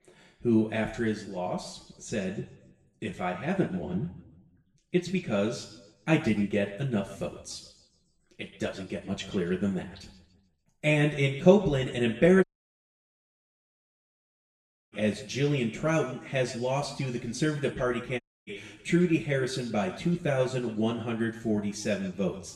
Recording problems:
off-mic speech; far
room echo; slight; dies away in 0.8 s
audio cutting out; at 12 s for 2.5 s and at 18 s

